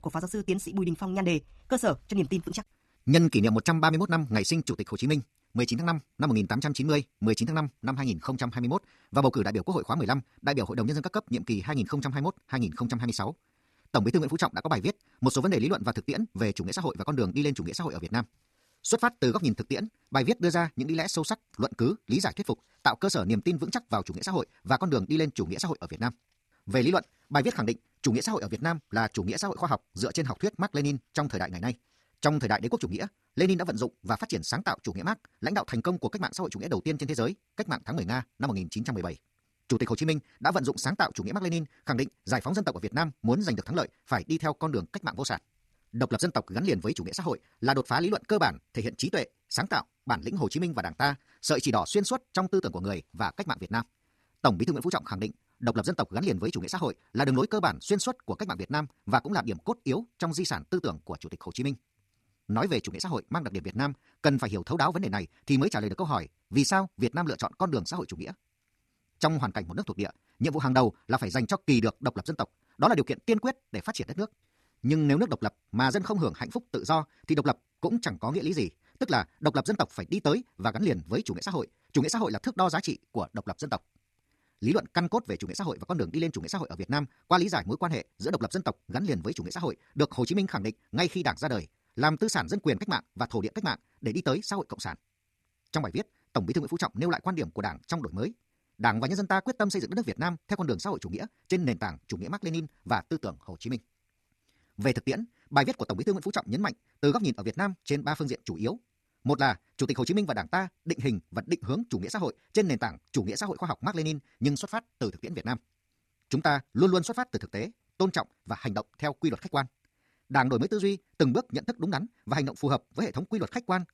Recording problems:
wrong speed, natural pitch; too fast; 1.7 times normal speed

